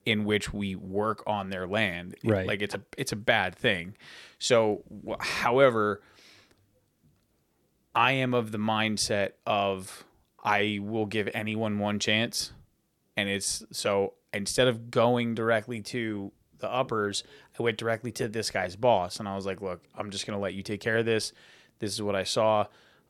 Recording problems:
none

